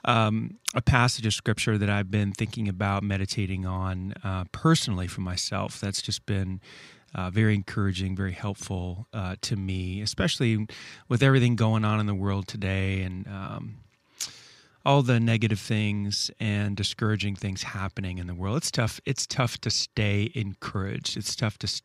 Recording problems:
none

